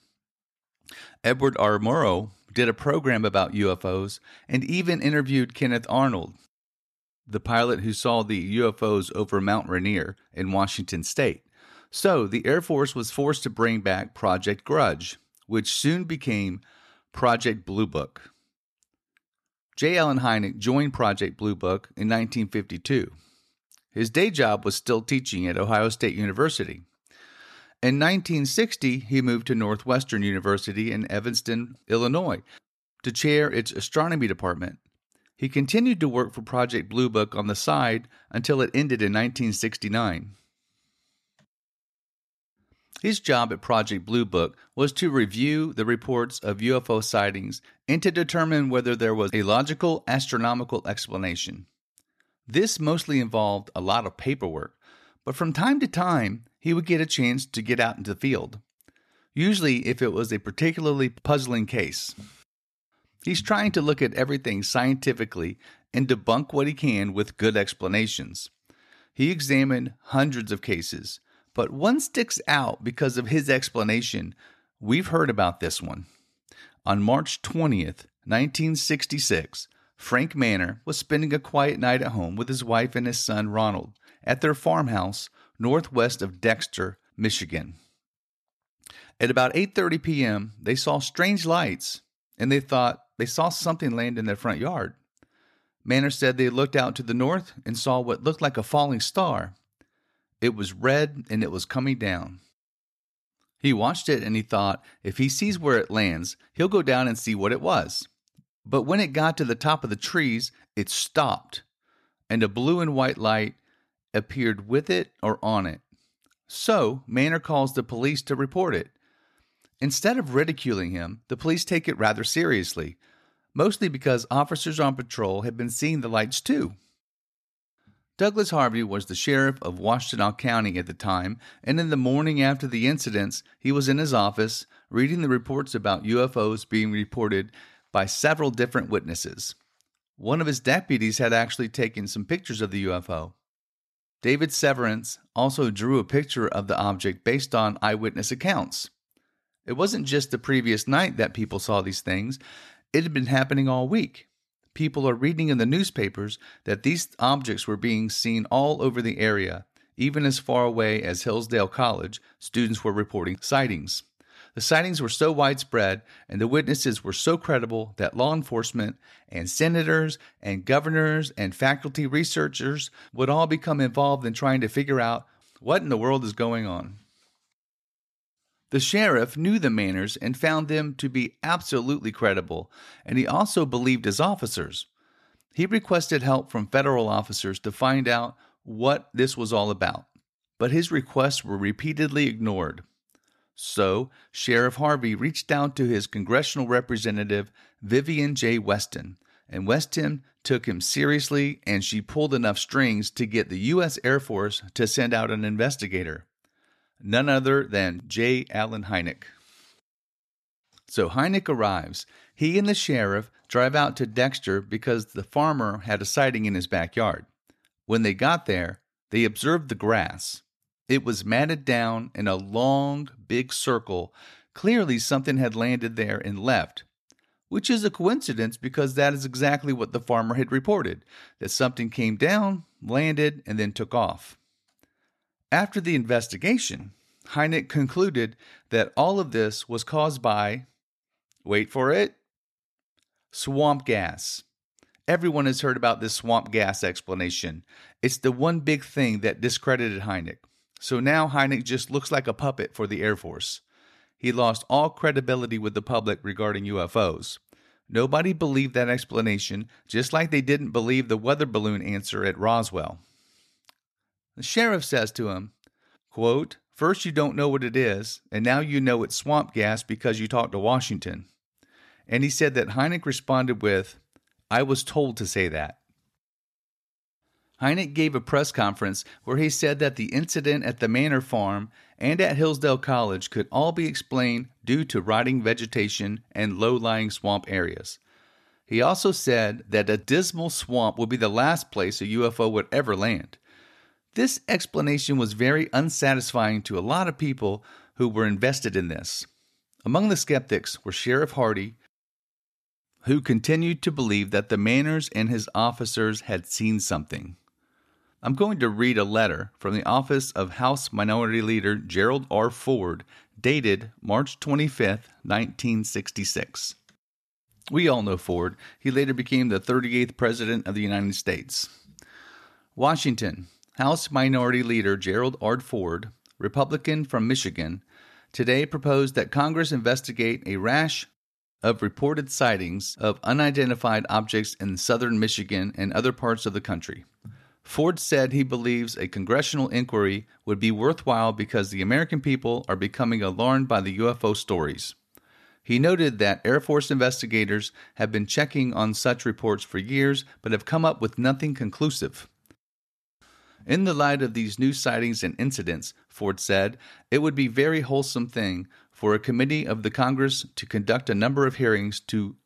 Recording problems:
none

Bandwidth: 13.5 kHz